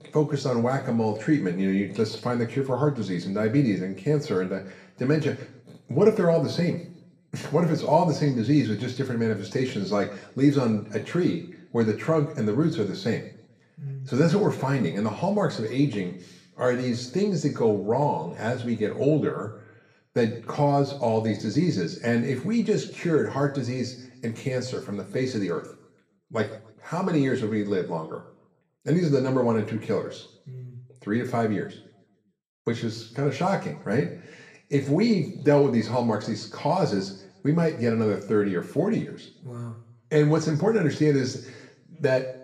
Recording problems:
room echo; slight; dies away in 0.6 s
off-mic speech; somewhat distant

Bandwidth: 14 kHz